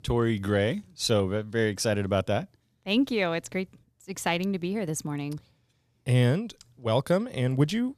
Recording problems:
none

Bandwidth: 14.5 kHz